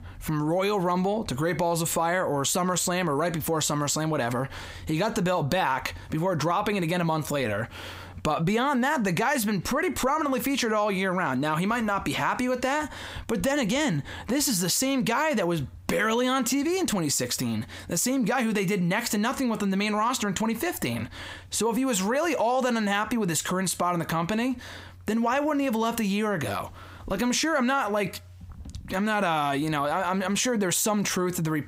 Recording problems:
squashed, flat; heavily

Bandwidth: 15.5 kHz